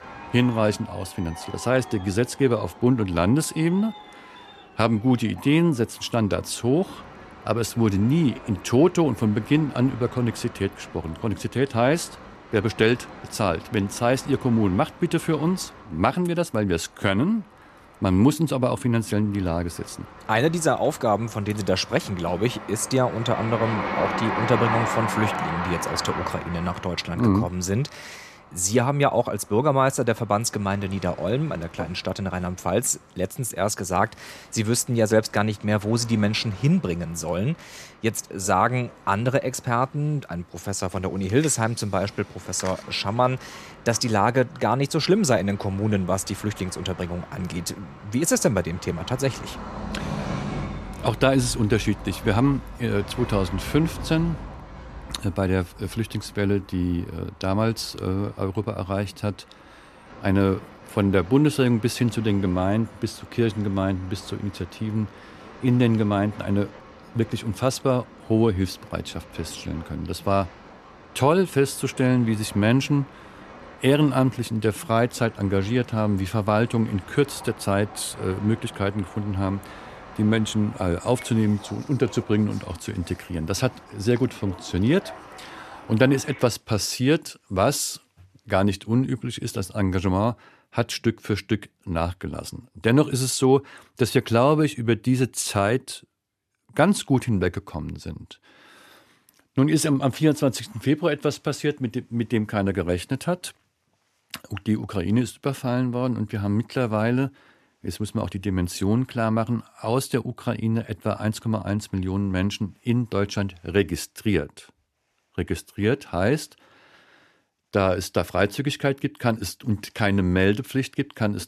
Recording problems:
train or aircraft noise; noticeable; until 1:26; 15 dB below the speech

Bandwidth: 14 kHz